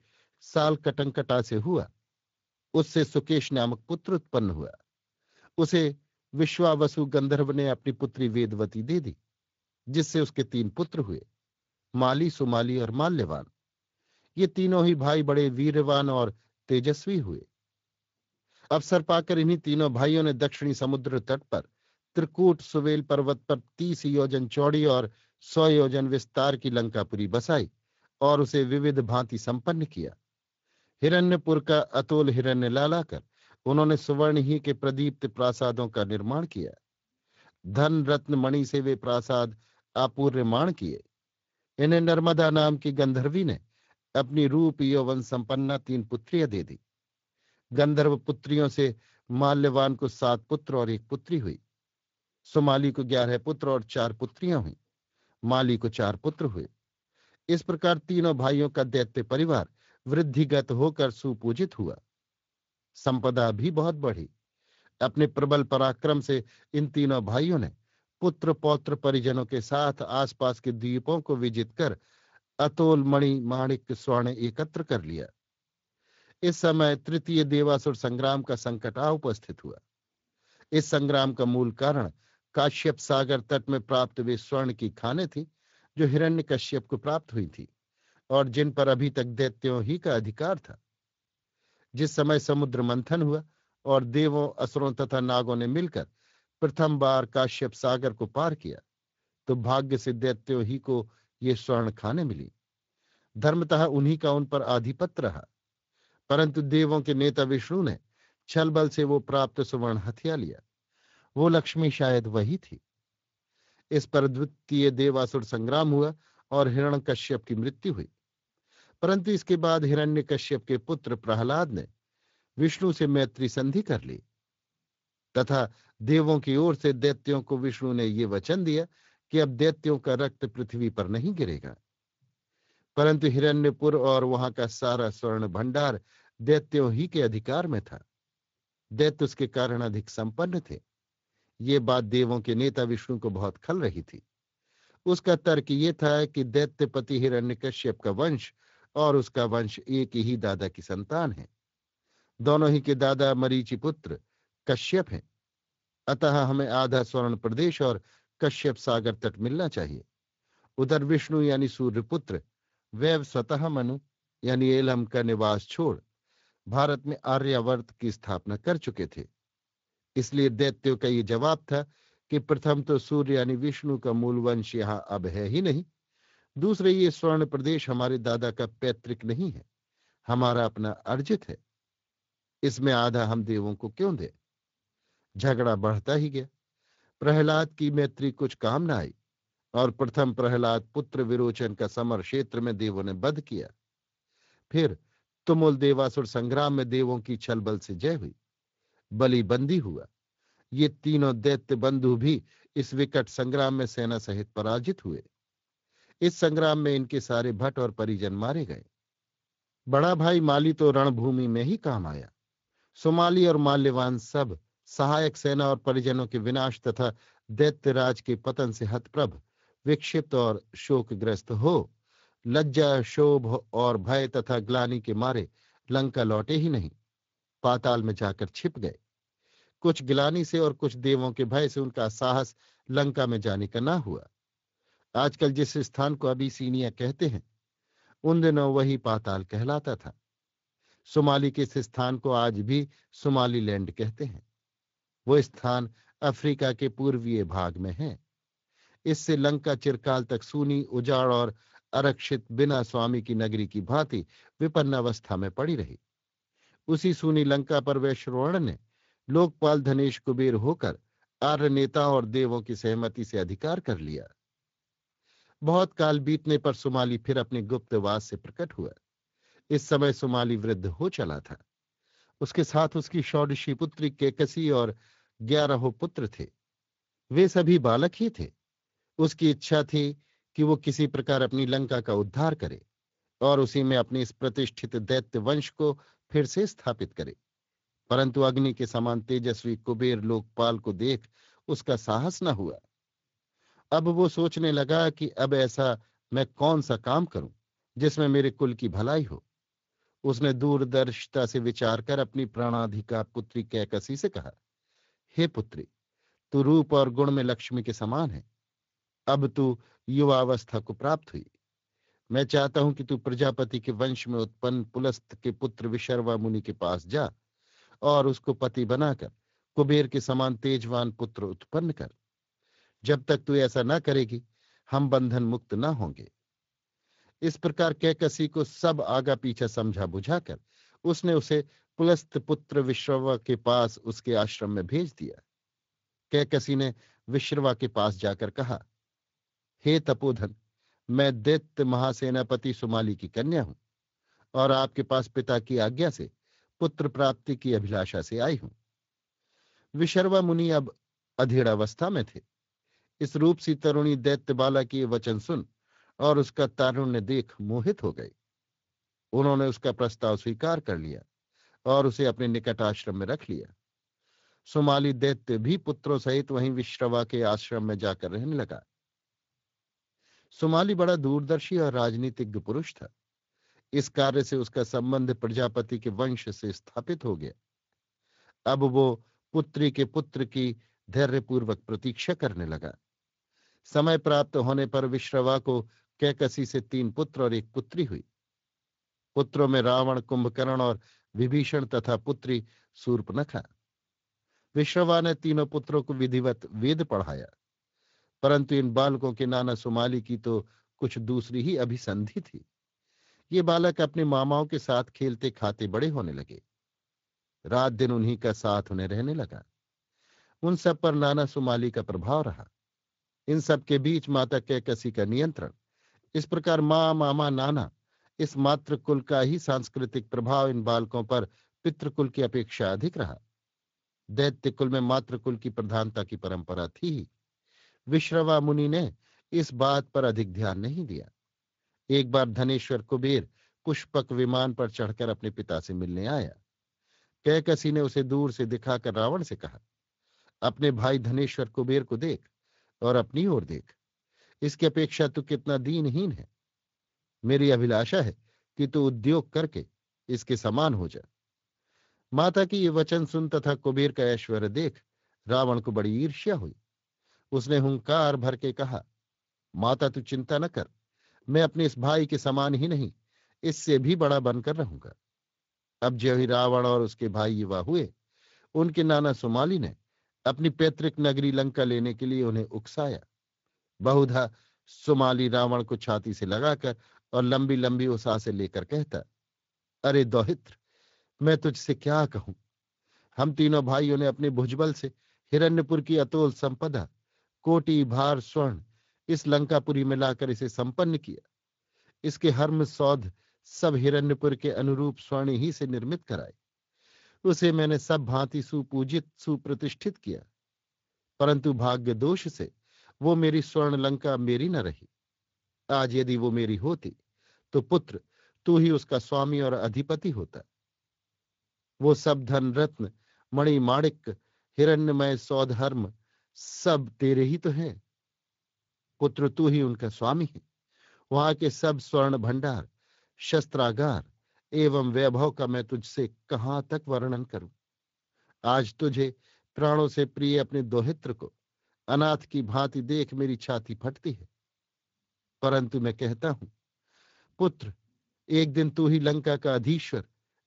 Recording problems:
garbled, watery; slightly; nothing above 7.5 kHz

